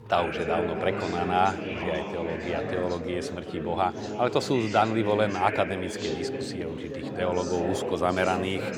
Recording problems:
chatter from many people; loud; throughout; 5 dB below the speech

